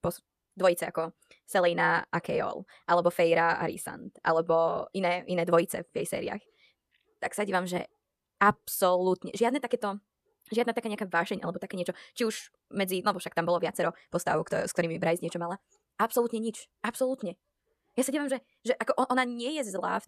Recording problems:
wrong speed, natural pitch; too fast; 1.6 times normal speed

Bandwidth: 14.5 kHz